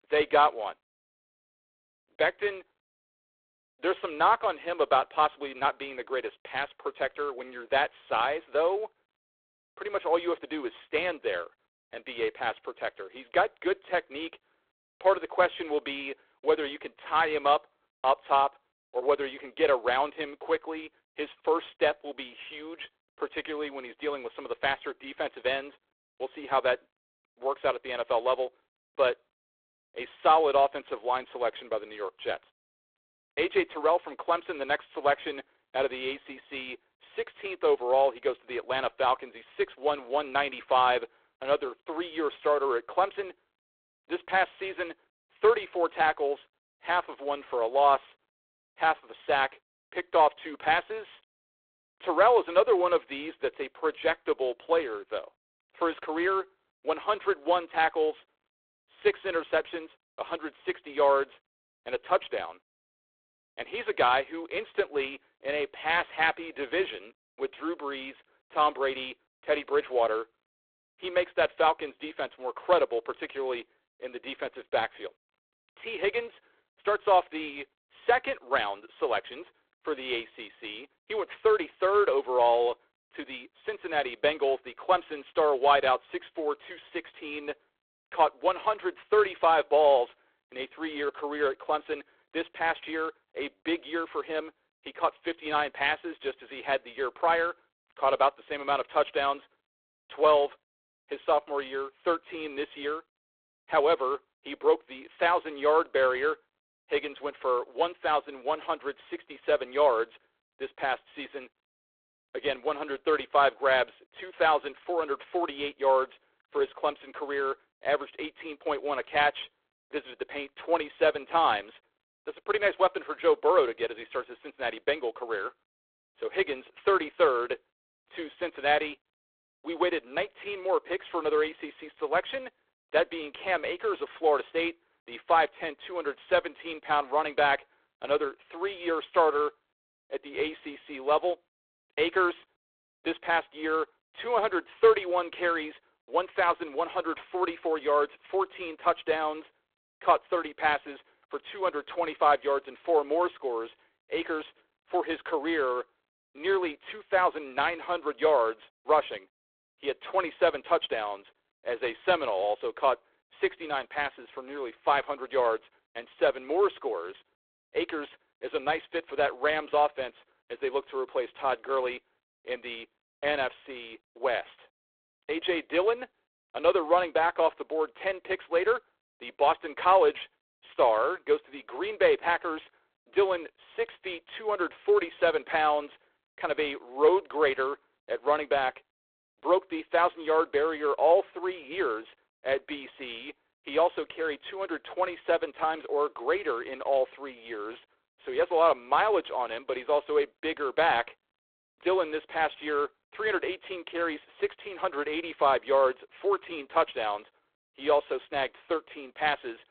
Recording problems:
phone-call audio; poor line

